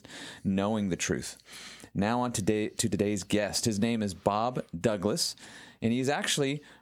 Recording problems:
squashed, flat; somewhat

